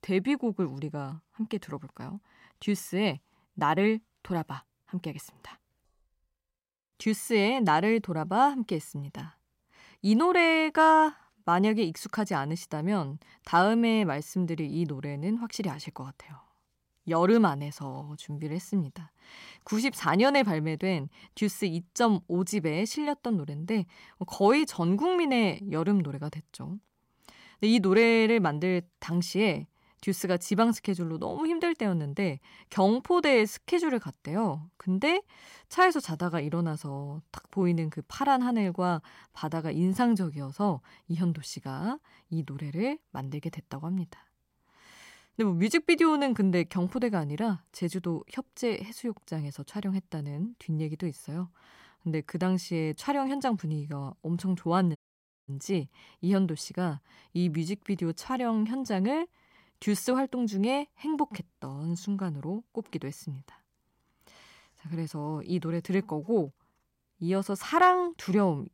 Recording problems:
audio cutting out; at 55 s for 0.5 s

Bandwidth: 16 kHz